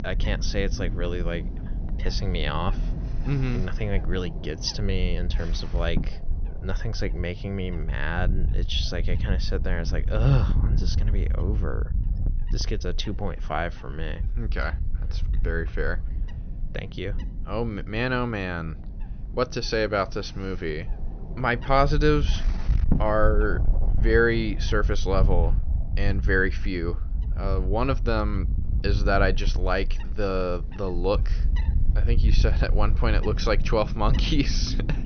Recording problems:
high frequencies cut off; noticeable; nothing above 6 kHz
wind noise on the microphone; occasional gusts; 15 dB below the speech

